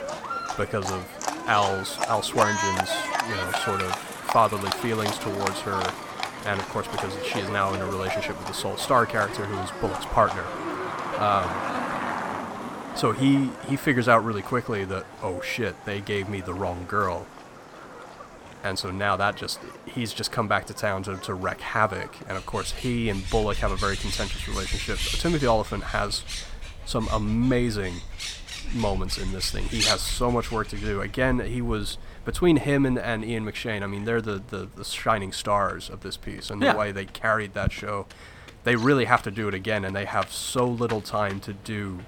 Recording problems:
animal sounds; loud; throughout; 6 dB below the speech

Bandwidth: 17.5 kHz